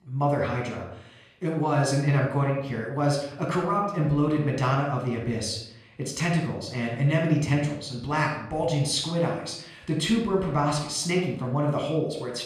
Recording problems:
room echo; noticeable; dies away in 0.6 s
off-mic speech; somewhat distant

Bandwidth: 13.5 kHz